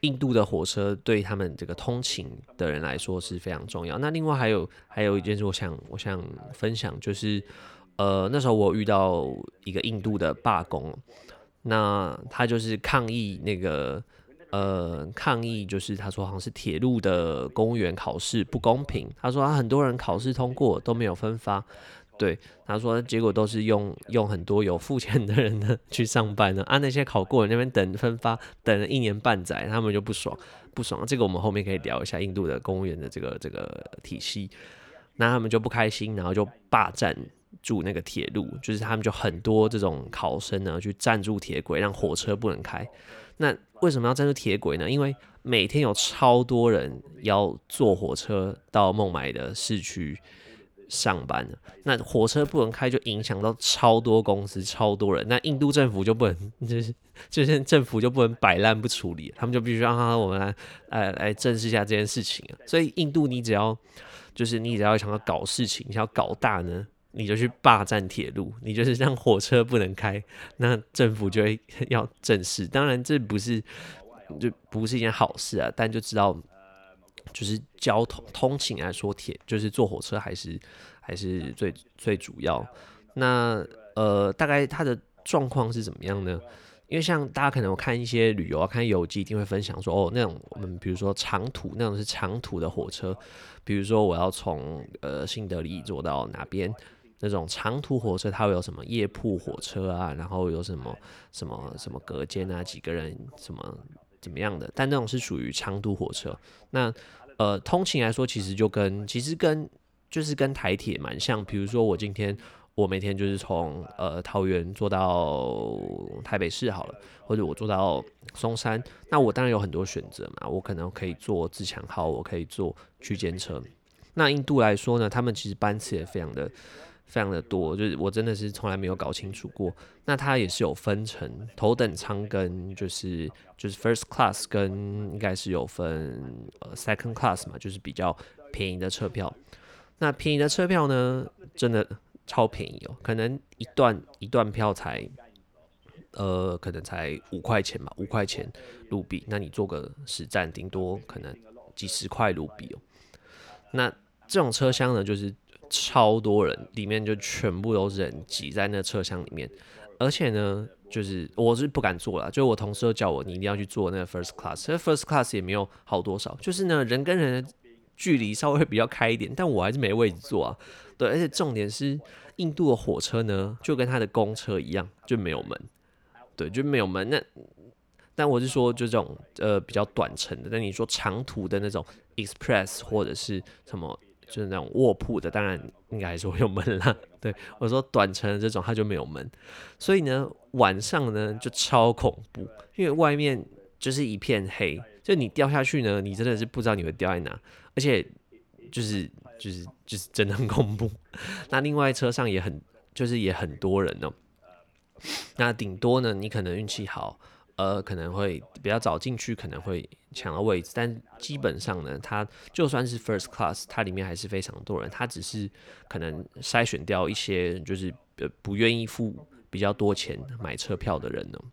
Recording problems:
voice in the background; faint; throughout; 30 dB below the speech

